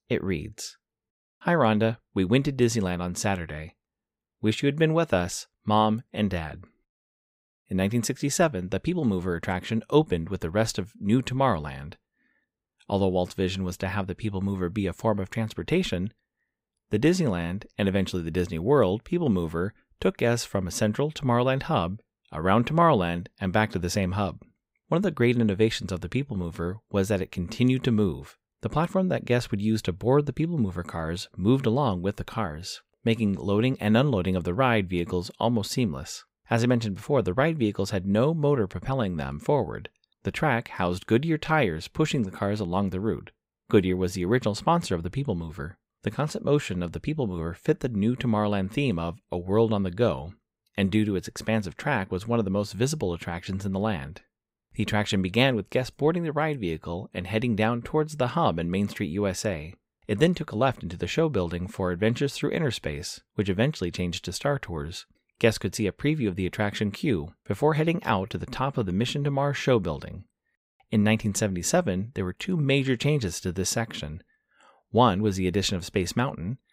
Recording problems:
none

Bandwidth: 15.5 kHz